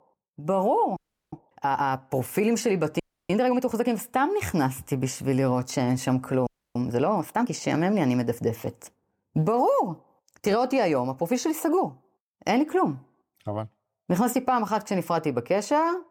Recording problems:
audio freezing; at 1 s, at 3 s and at 6.5 s

